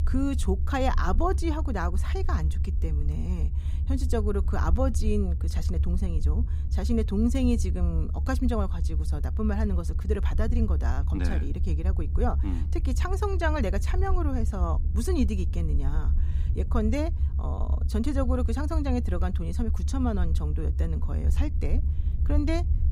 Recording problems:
low rumble; noticeable; throughout; 15 dB below the speech

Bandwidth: 15.5 kHz